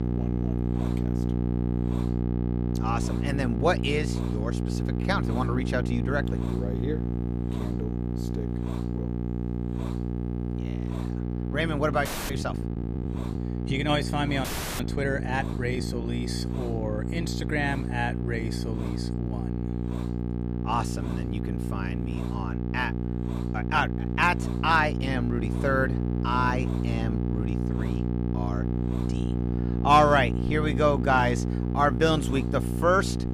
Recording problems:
electrical hum; loud; throughout; 60 Hz, 10 dB below the speech
hiss; faint; throughout; 20 dB below the speech
audio freezing; at 12 s and at 14 s

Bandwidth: 14.5 kHz